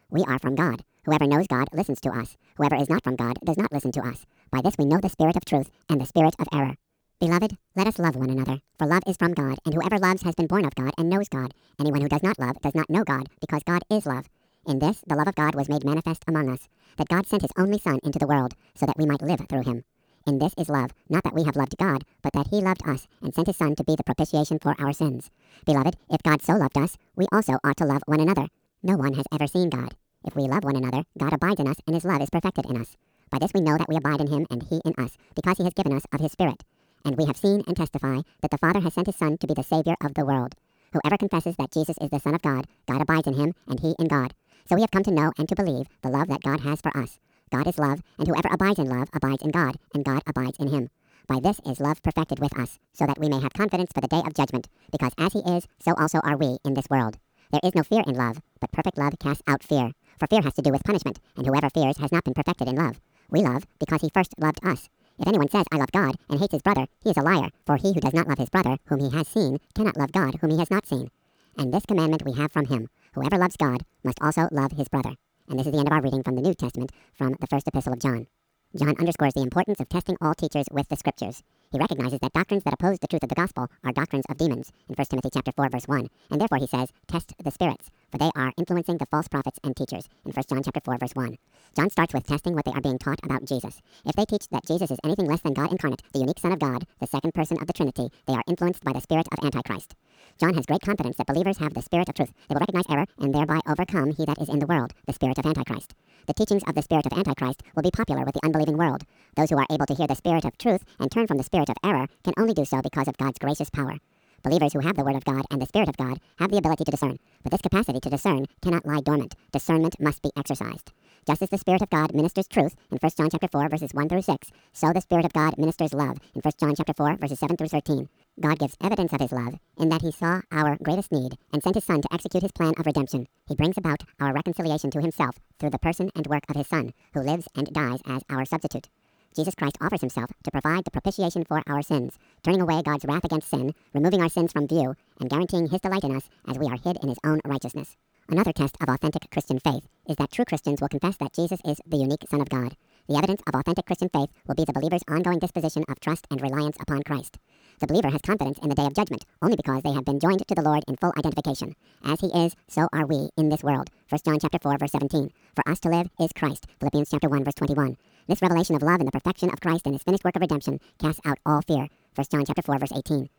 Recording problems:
wrong speed and pitch; too fast and too high; 1.7 times normal speed
uneven, jittery; strongly; from 22 s to 2:11

